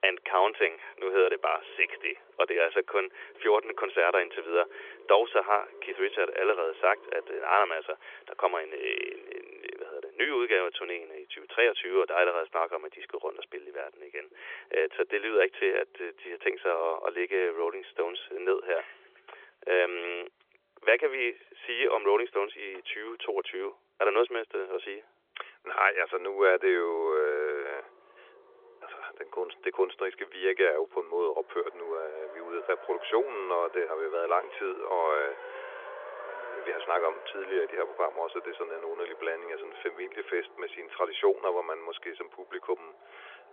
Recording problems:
phone-call audio; nothing above 3.5 kHz
traffic noise; noticeable; throughout; 20 dB below the speech

